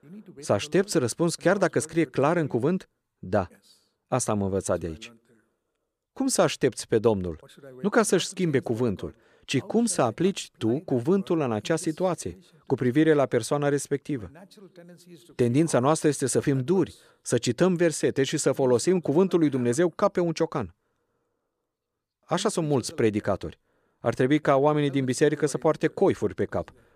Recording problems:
none

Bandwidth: 14.5 kHz